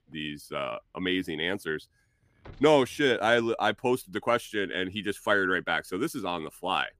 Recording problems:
traffic noise; faint; throughout; 30 dB below the speech

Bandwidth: 15 kHz